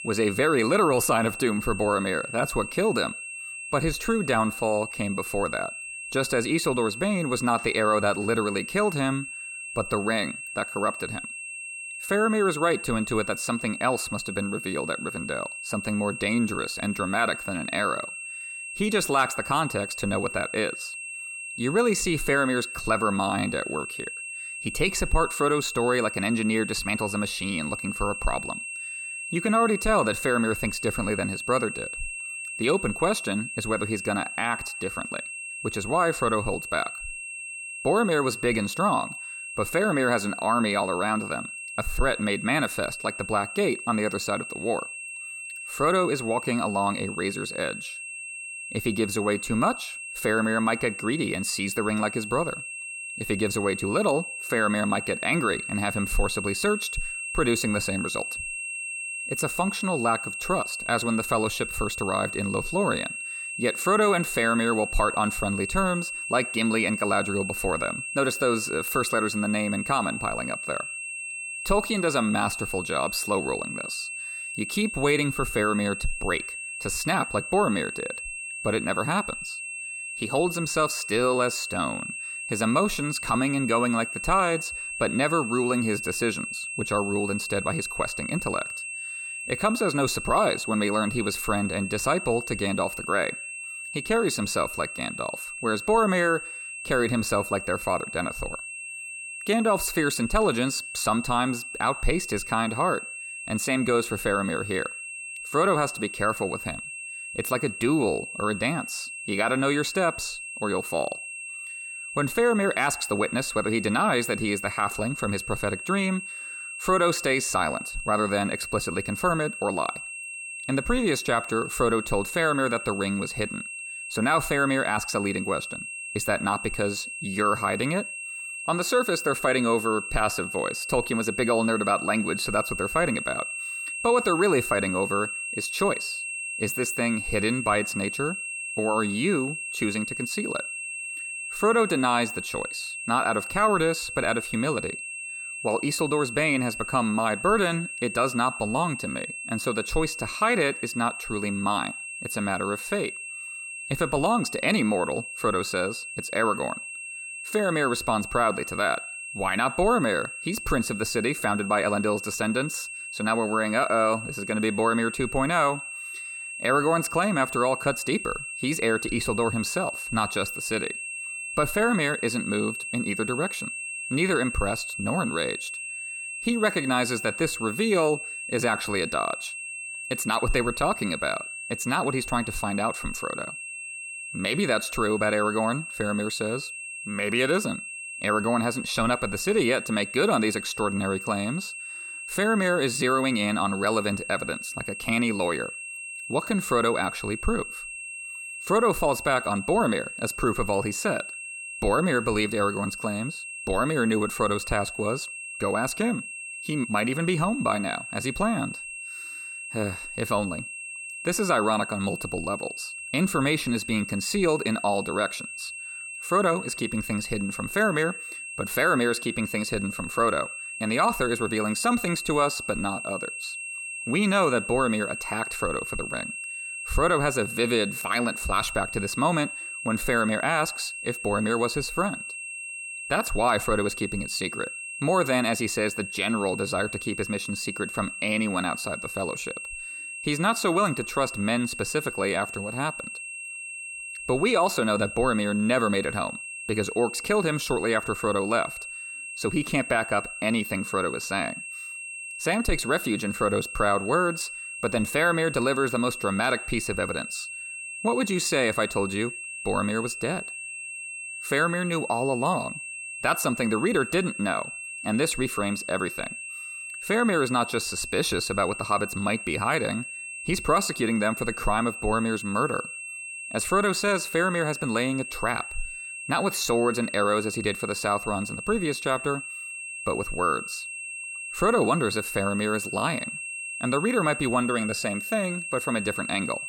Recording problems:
high-pitched whine; loud; throughout; 2.5 kHz, 7 dB below the speech

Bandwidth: 18 kHz